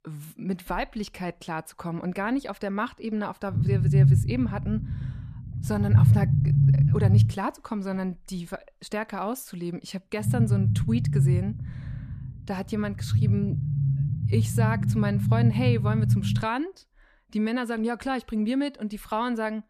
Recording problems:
low rumble; loud; from 3.5 to 7.5 s and from 10 to 16 s; 3 dB below the speech

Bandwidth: 14.5 kHz